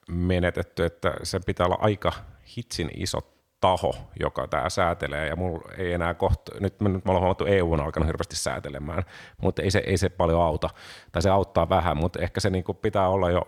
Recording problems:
none

